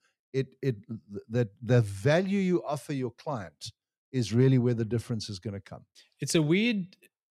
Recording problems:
none

